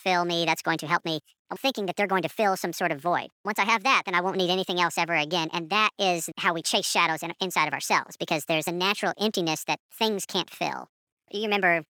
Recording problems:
wrong speed and pitch; too fast and too high; 1.5 times normal speed

